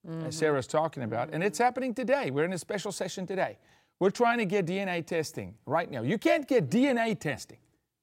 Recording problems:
none

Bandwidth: 16 kHz